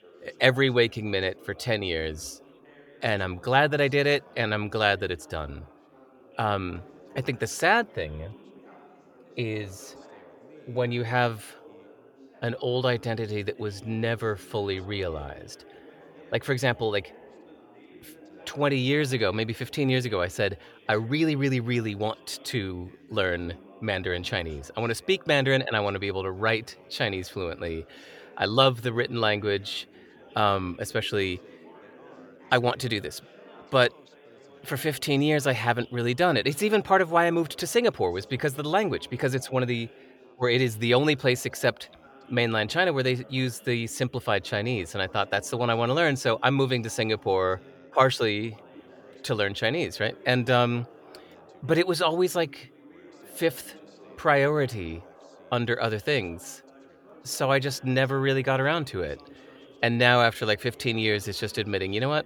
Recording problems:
chatter from many people; faint; throughout; 25 dB below the speech

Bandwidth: 18 kHz